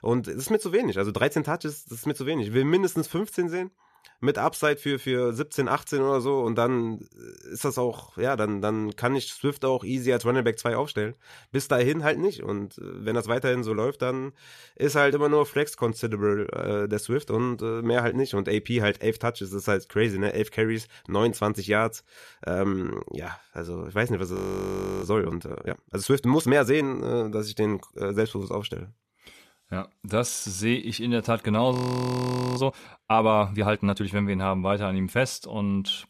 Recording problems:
audio freezing; at 24 s for 0.5 s and at 32 s for 1 s

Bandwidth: 14 kHz